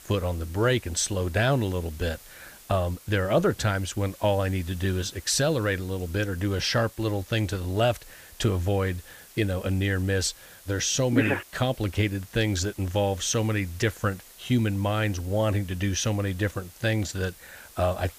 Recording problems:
hiss; faint; throughout; 20 dB below the speech

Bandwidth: 15 kHz